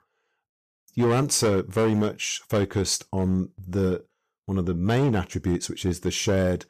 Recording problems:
distortion; slight; 7% of the sound clipped

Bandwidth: 14.5 kHz